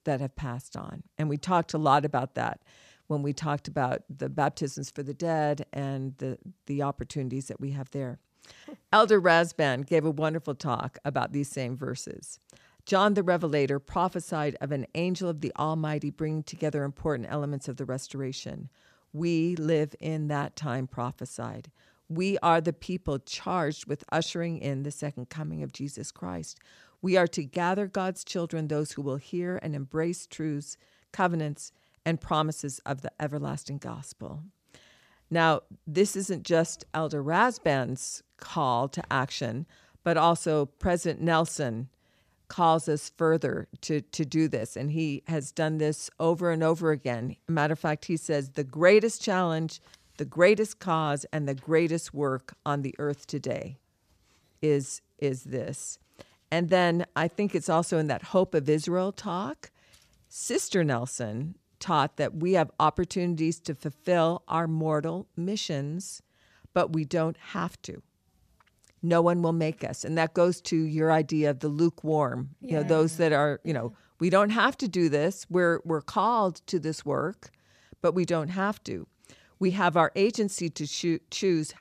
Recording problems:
none

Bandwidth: 14.5 kHz